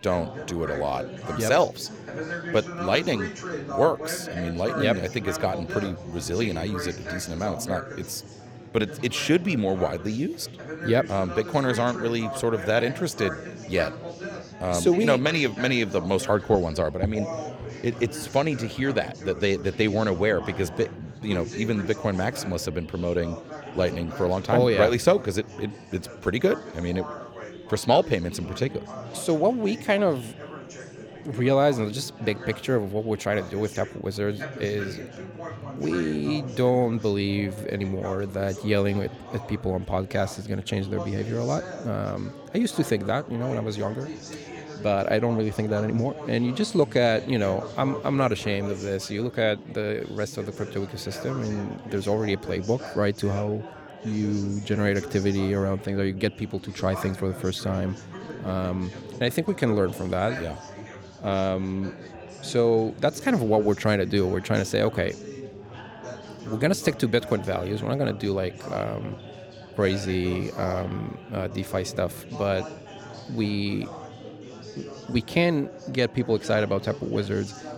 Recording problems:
chatter from many people; noticeable; throughout; 10 dB below the speech

